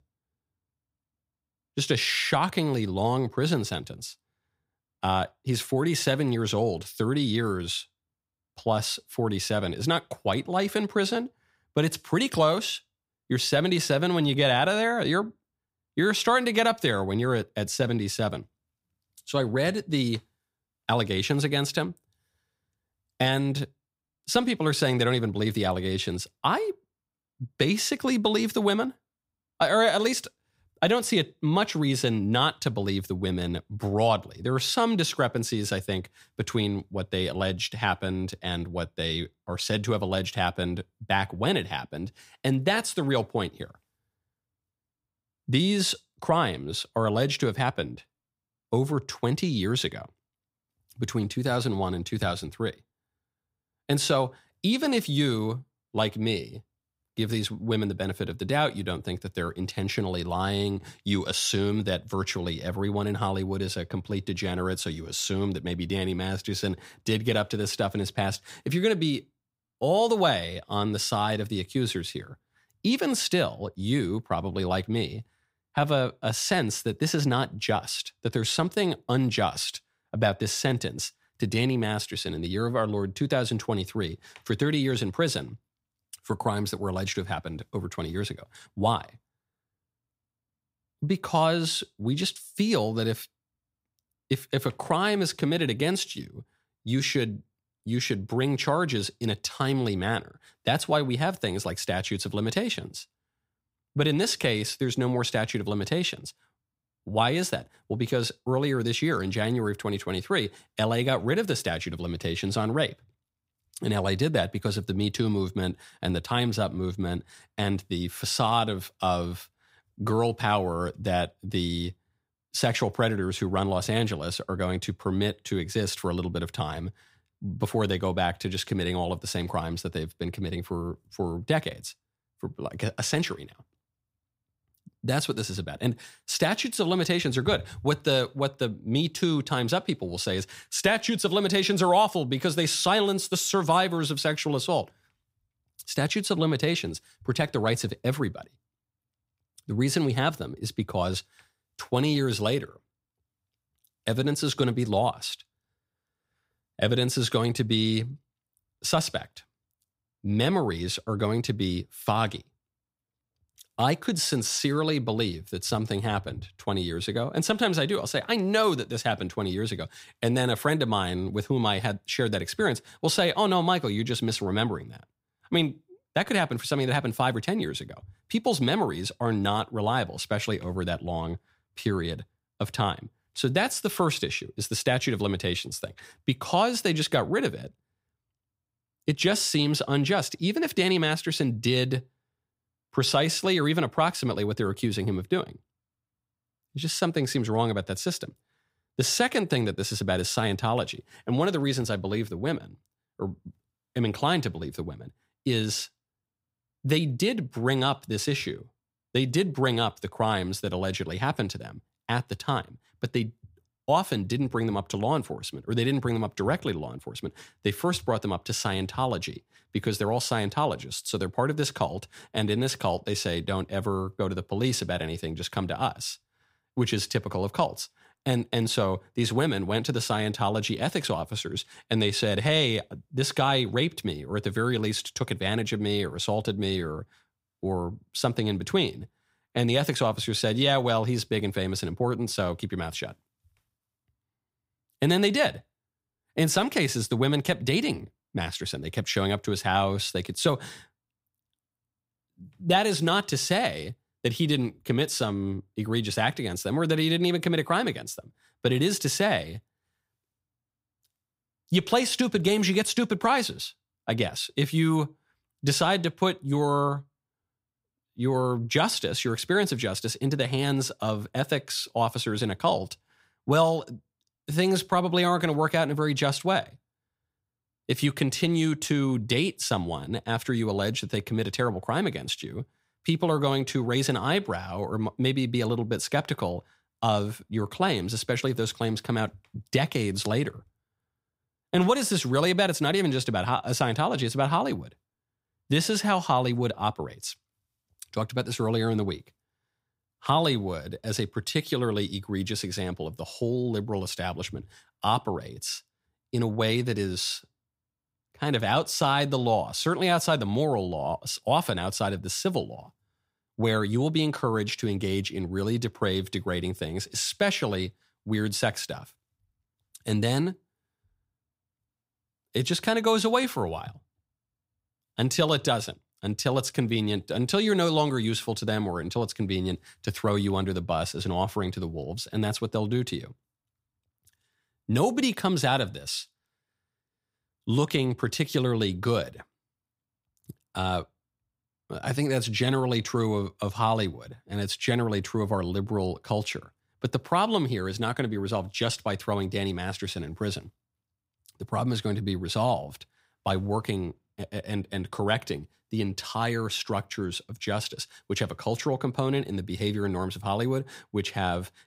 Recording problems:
none

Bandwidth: 15.5 kHz